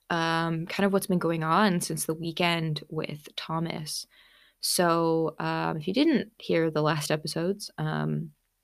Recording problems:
none

